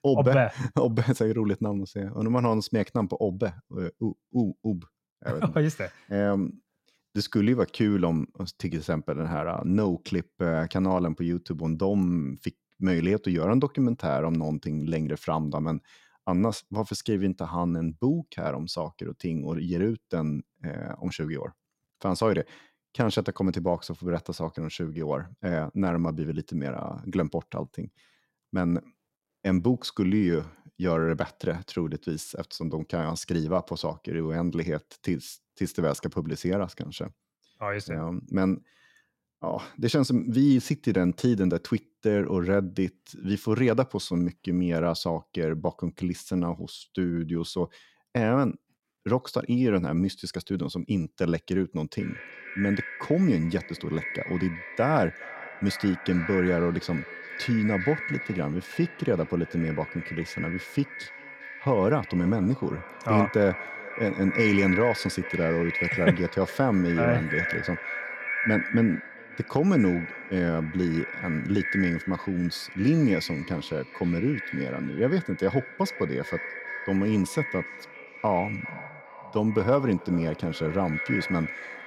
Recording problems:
echo of what is said; strong; from 52 s on; 410 ms later, 7 dB below the speech

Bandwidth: 16 kHz